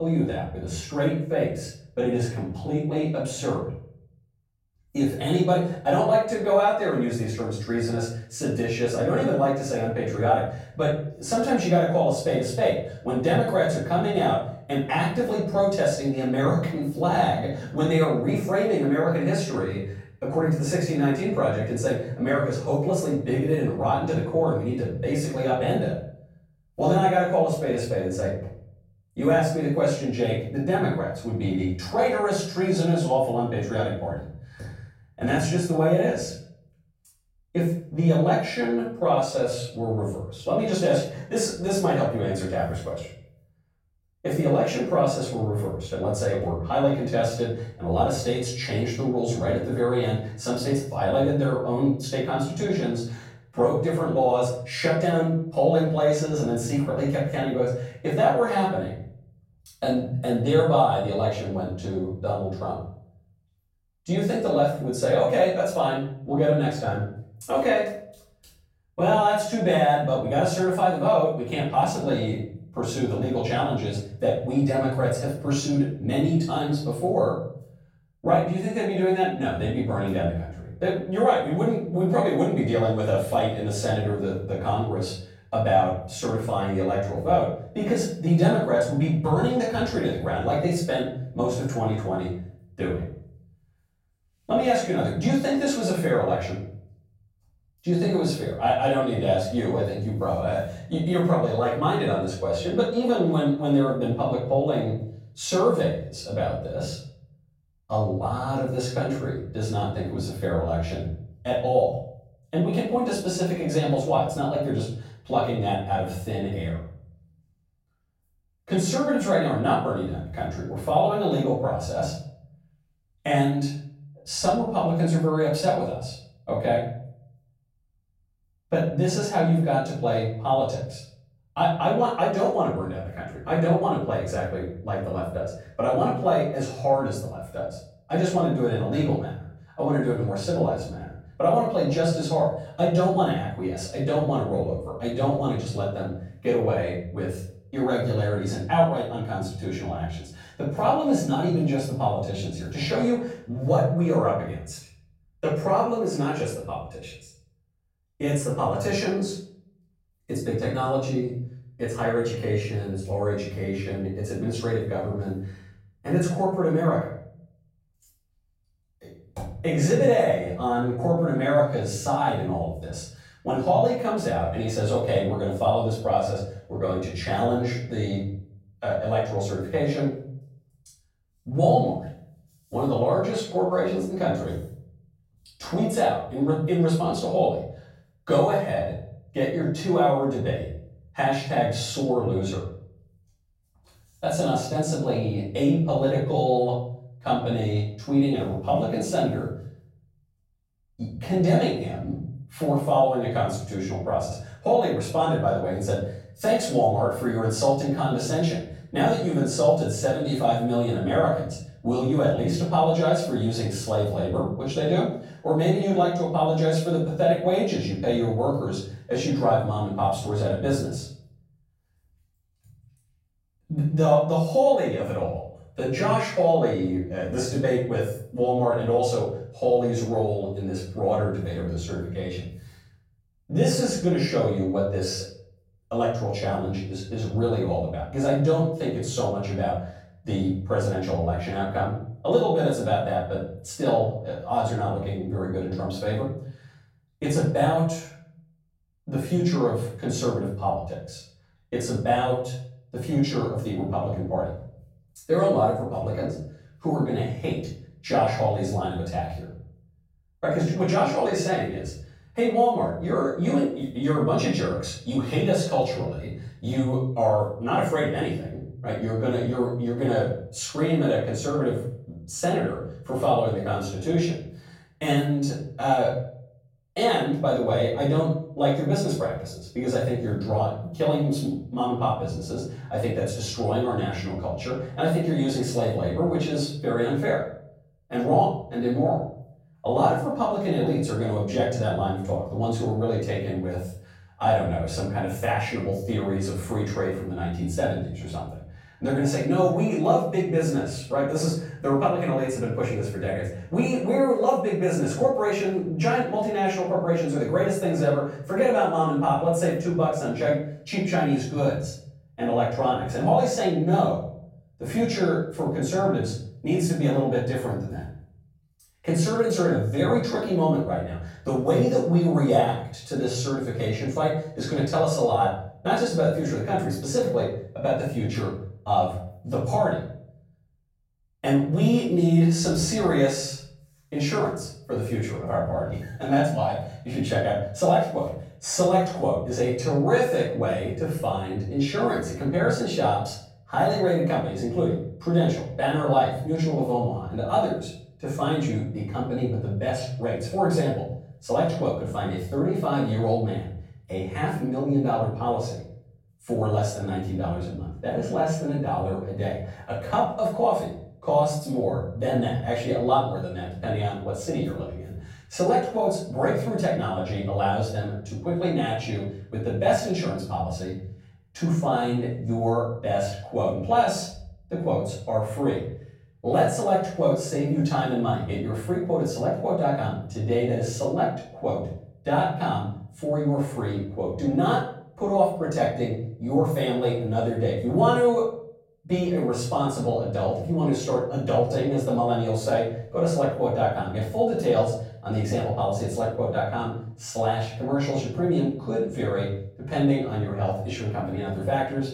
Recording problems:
off-mic speech; far
room echo; noticeable; dies away in 0.6 s
abrupt cut into speech; at the start

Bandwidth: 16.5 kHz